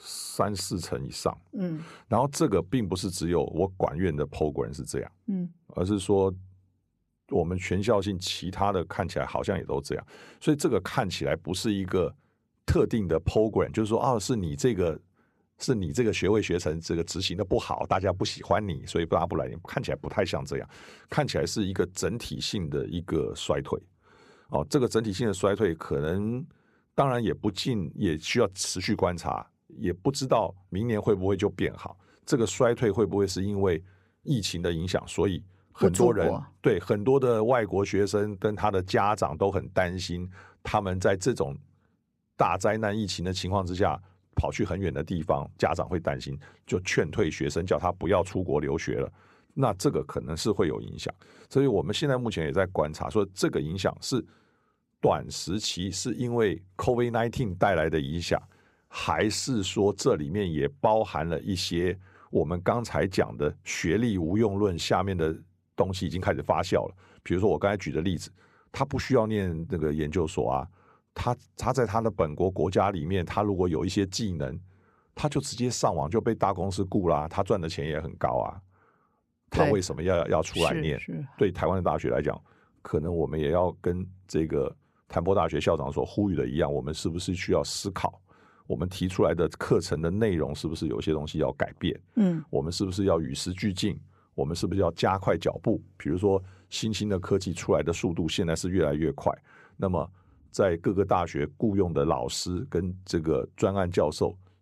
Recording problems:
none

